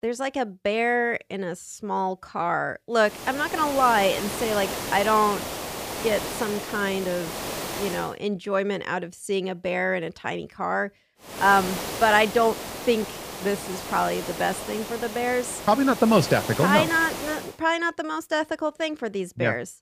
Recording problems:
hiss; loud; from 3 to 8 s and from 11 to 17 s; 8 dB below the speech

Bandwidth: 15 kHz